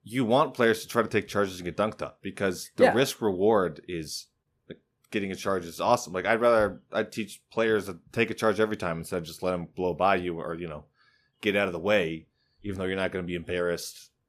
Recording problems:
none

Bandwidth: 14.5 kHz